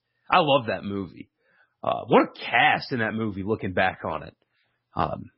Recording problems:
garbled, watery; badly; nothing above 5.5 kHz

